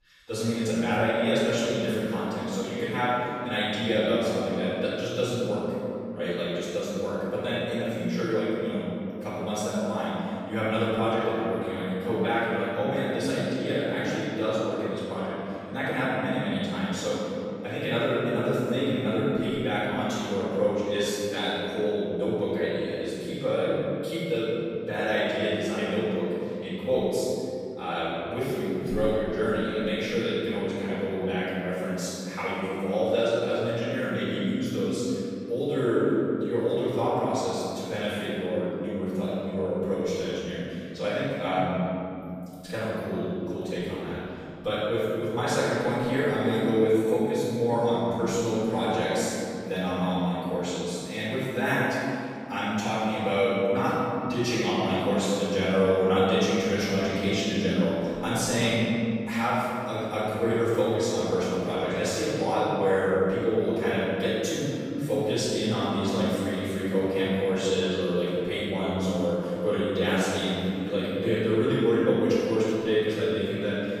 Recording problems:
room echo; strong; dies away in 2.8 s
off-mic speech; far

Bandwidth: 15 kHz